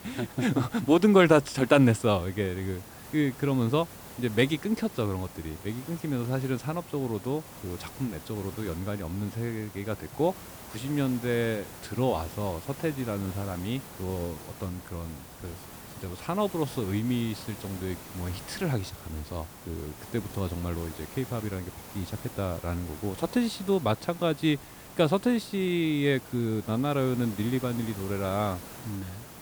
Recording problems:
hiss; noticeable; throughout; 15 dB below the speech

